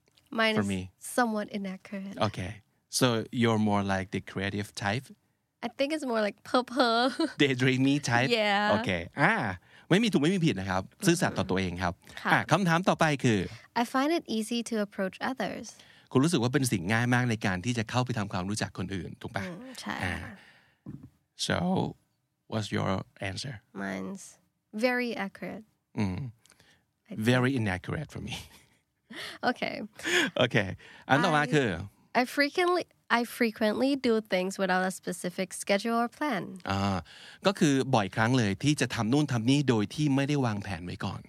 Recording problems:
none

